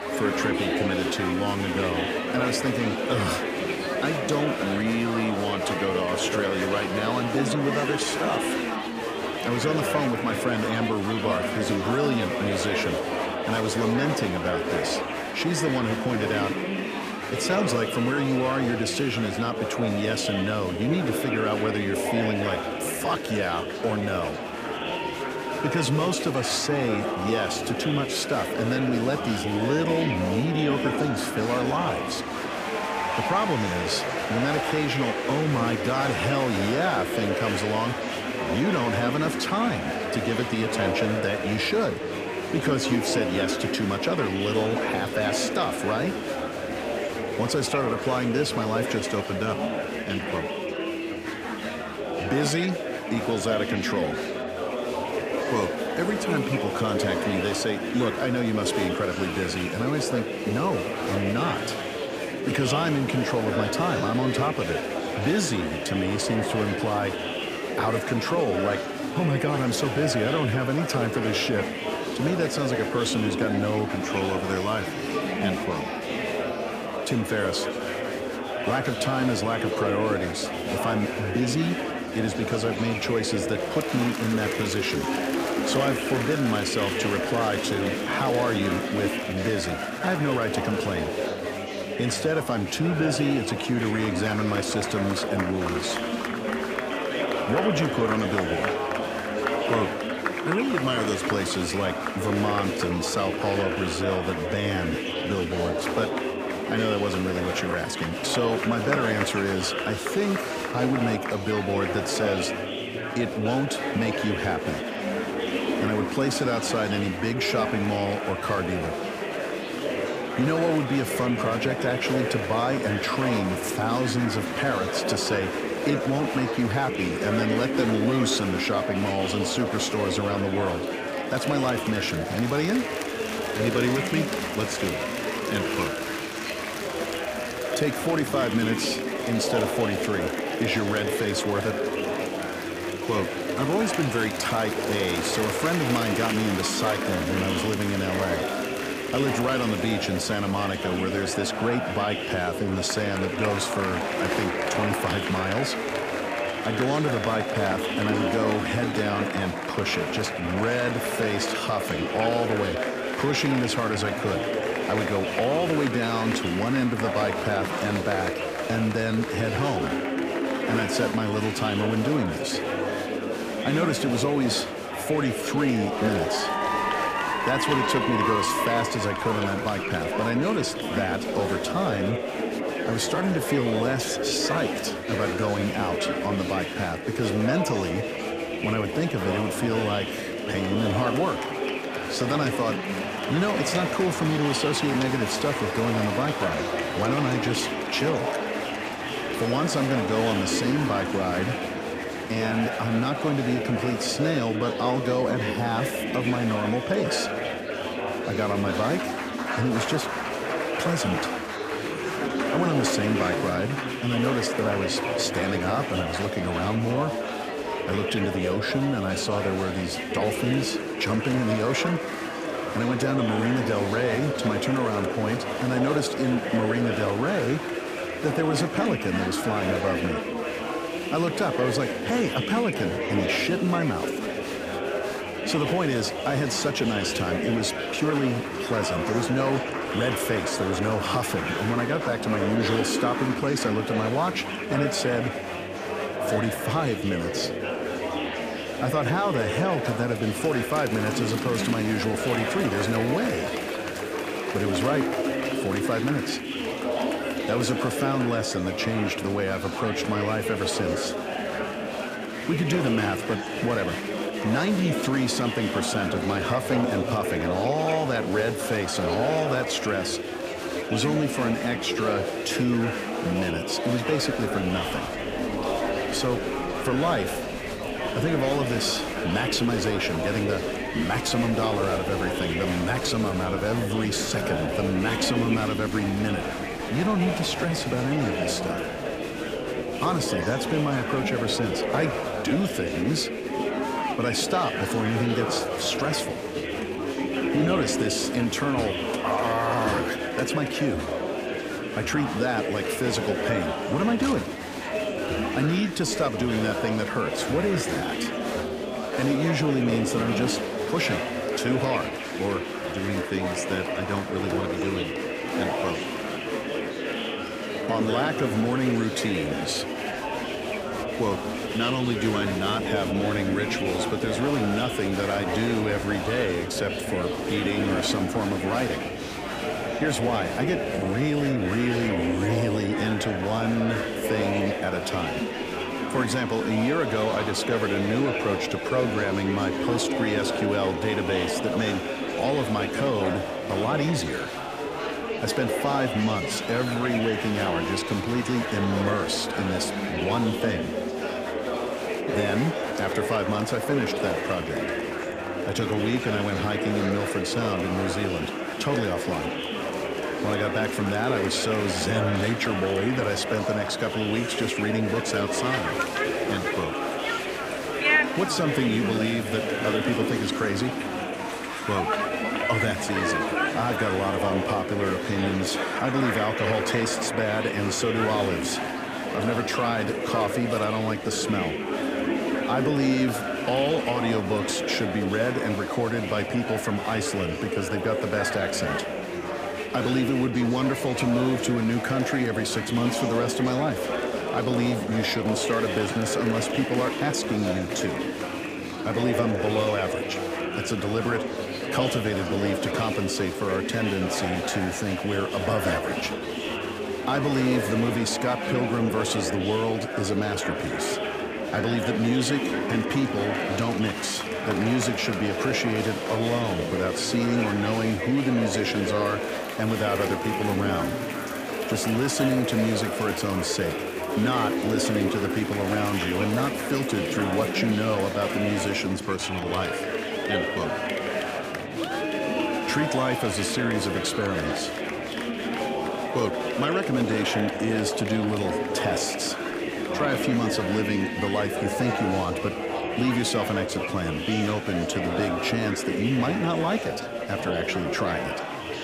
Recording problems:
murmuring crowd; loud; throughout; 1 dB below the speech

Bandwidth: 15 kHz